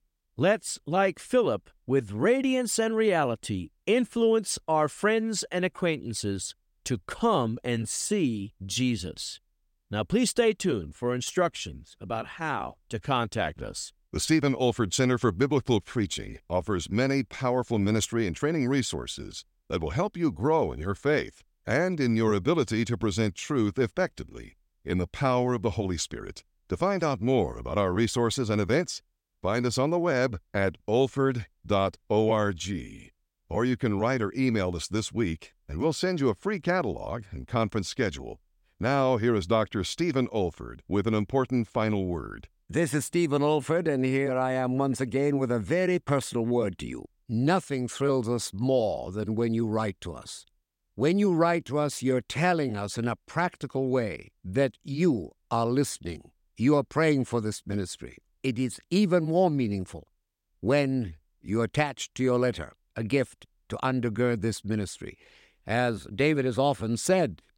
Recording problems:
none

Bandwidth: 16.5 kHz